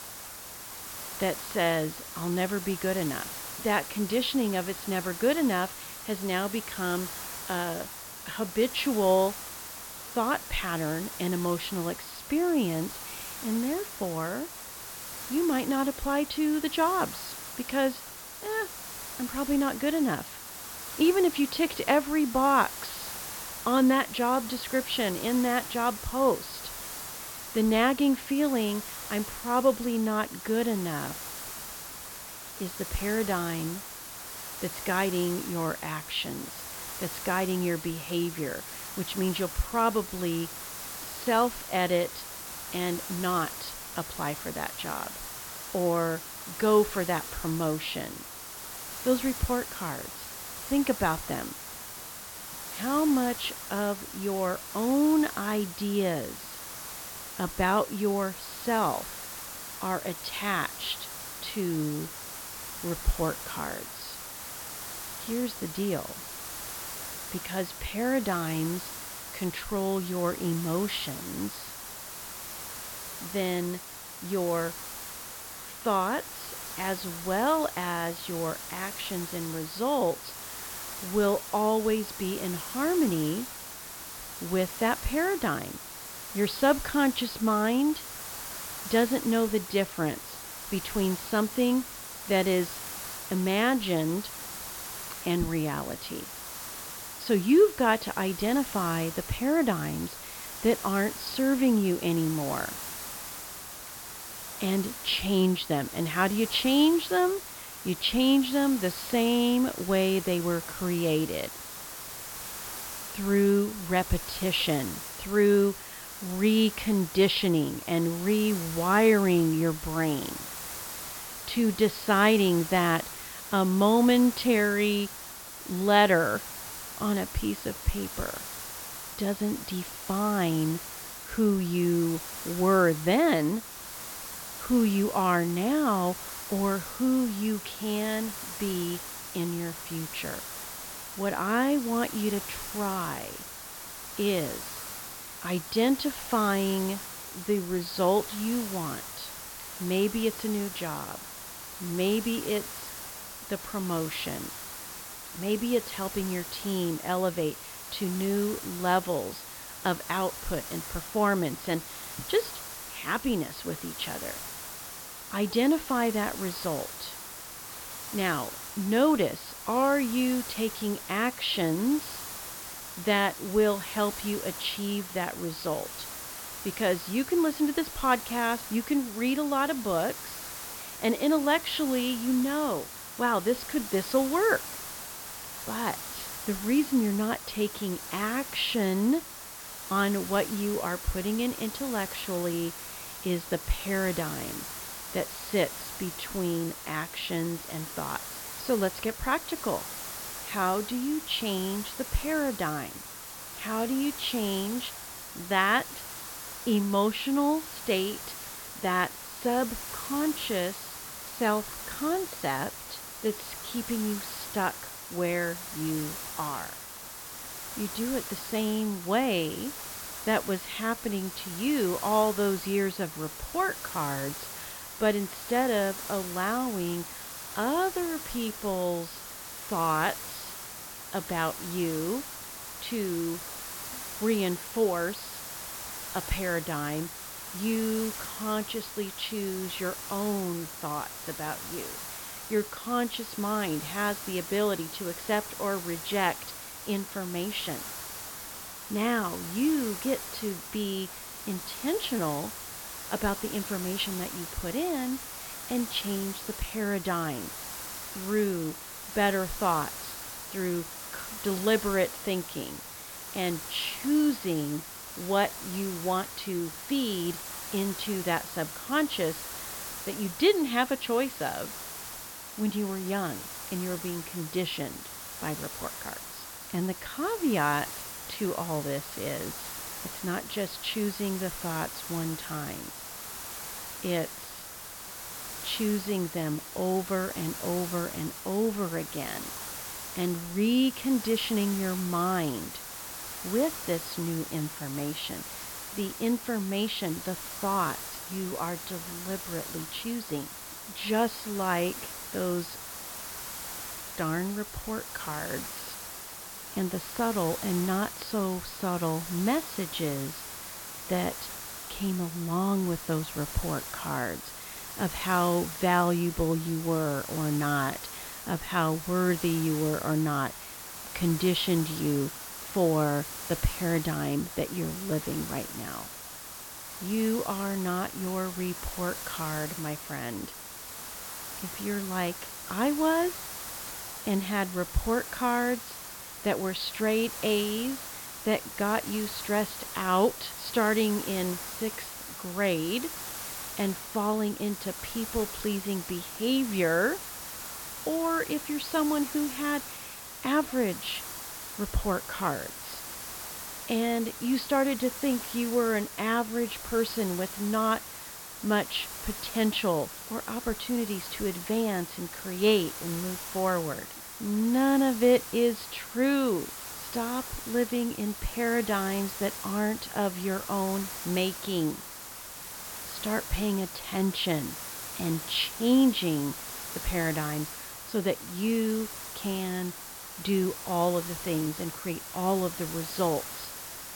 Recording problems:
high frequencies cut off; noticeable; nothing above 5.5 kHz
hiss; loud; throughout; 8 dB below the speech

